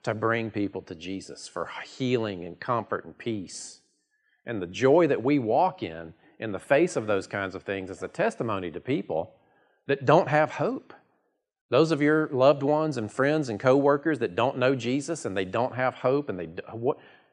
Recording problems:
none

